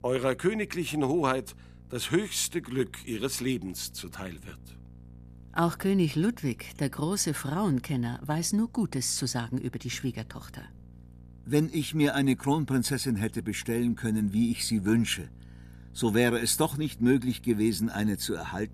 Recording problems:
electrical hum; faint; throughout; 60 Hz, 30 dB below the speech

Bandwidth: 14.5 kHz